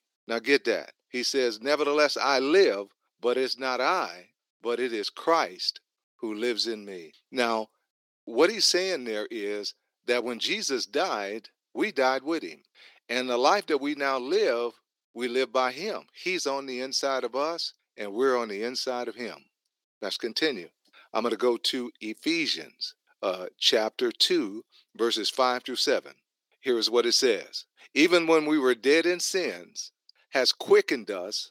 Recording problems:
thin; somewhat; fading below 350 Hz

